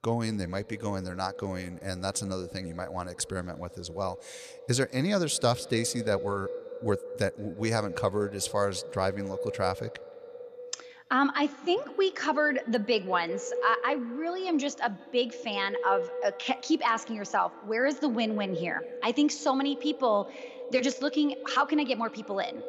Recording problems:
echo of what is said; strong; throughout; 170 ms later, 10 dB below the speech

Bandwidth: 14.5 kHz